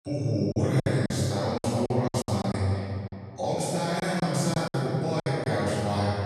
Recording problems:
room echo; strong; dies away in 2.4 s
off-mic speech; far
choppy; very; from 0.5 to 2.5 s and from 4 to 5.5 s; 15% of the speech affected

